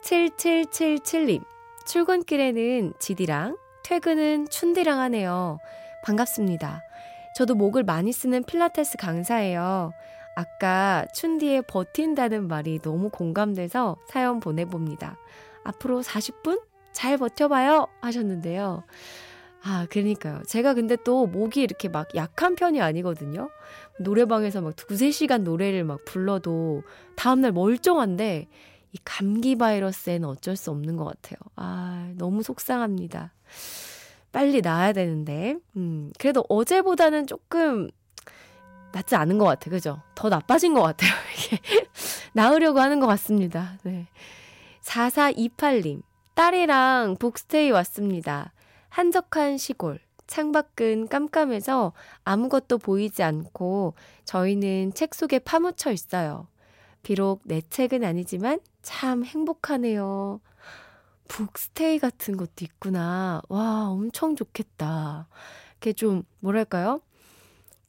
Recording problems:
background music; faint; throughout; 25 dB below the speech

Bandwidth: 16 kHz